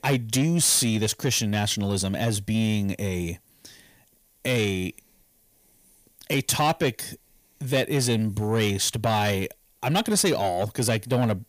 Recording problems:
distortion; slight; 10 dB below the speech

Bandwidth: 15 kHz